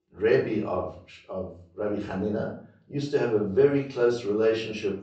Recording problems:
off-mic speech; far
high frequencies cut off; noticeable; nothing above 8 kHz
room echo; slight; dies away in 0.4 s

